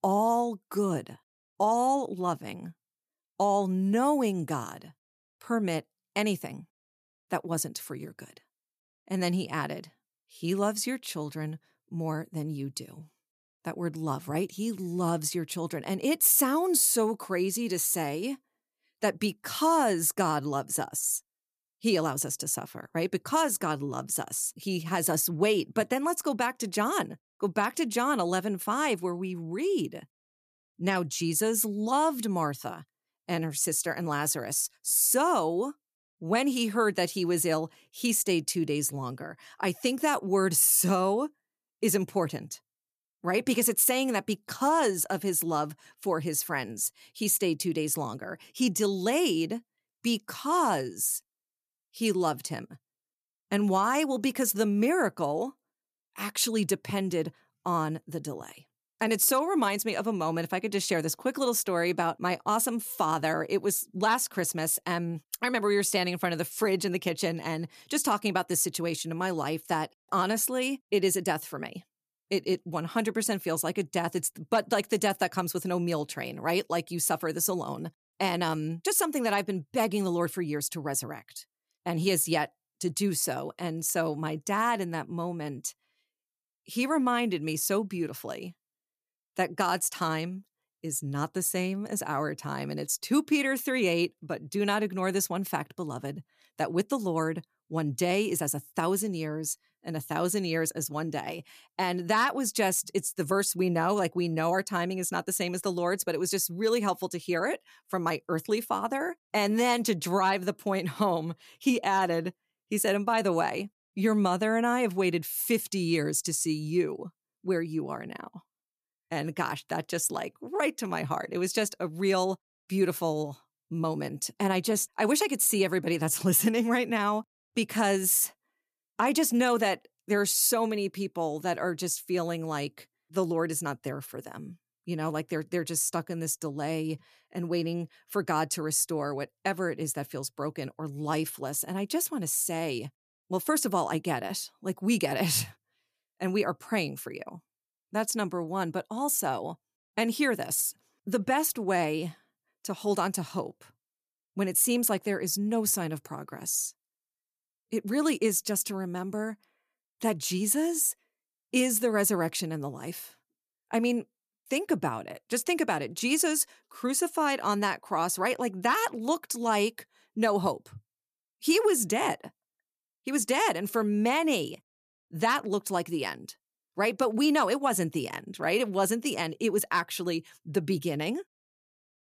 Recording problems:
none

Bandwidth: 14.5 kHz